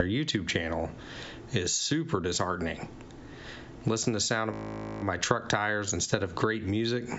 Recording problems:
high frequencies cut off; noticeable; nothing above 8 kHz
squashed, flat; somewhat
abrupt cut into speech; at the start
audio freezing; at 4.5 s for 0.5 s

